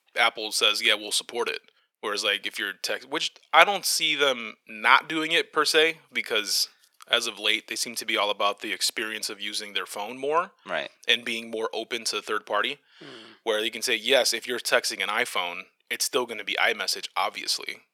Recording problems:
thin; very; fading below 450 Hz

